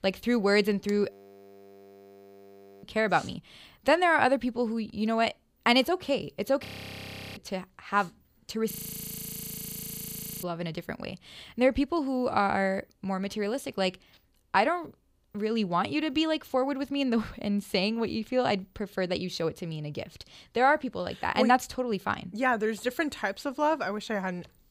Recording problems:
audio freezing; at 1 s for 1.5 s, at 6.5 s for 0.5 s and at 8.5 s for 1.5 s

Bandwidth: 15 kHz